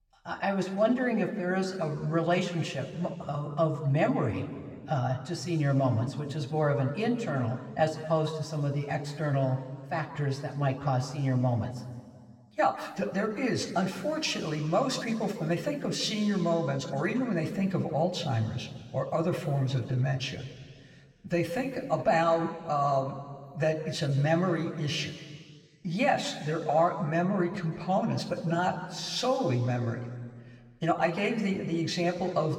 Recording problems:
room echo; slight; dies away in 1.7 s
off-mic speech; somewhat distant

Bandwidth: 16.5 kHz